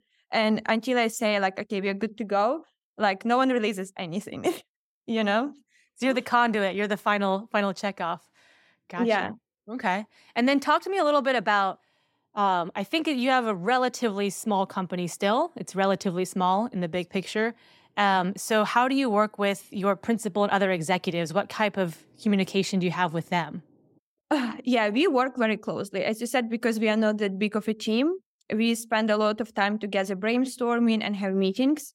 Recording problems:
none

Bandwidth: 16.5 kHz